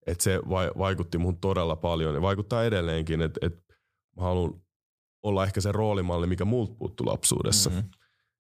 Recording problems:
none

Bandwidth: 15 kHz